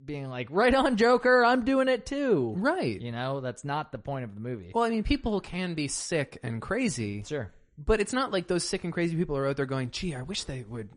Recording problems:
garbled, watery; slightly; nothing above 10 kHz

